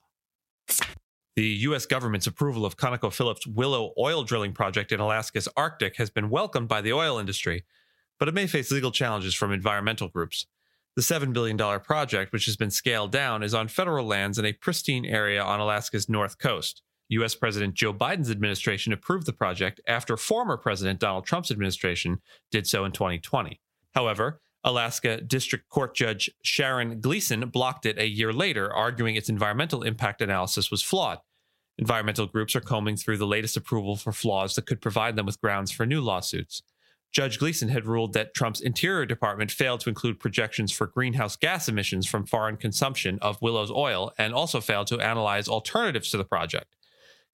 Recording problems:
squashed, flat; somewhat

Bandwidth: 16.5 kHz